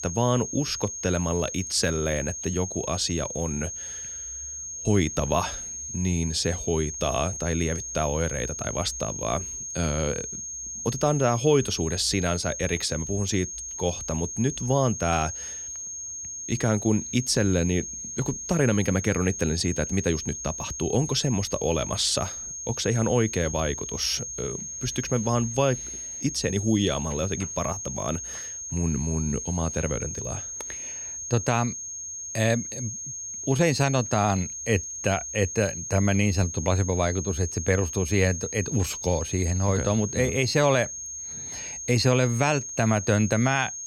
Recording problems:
high-pitched whine; loud; throughout; 6.5 kHz, 6 dB below the speech

